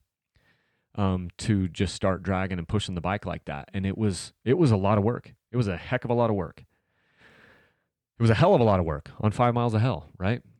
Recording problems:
none

